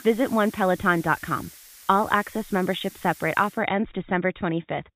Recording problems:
high frequencies cut off; severe; nothing above 4 kHz
hiss; noticeable; until 3.5 s; 20 dB below the speech

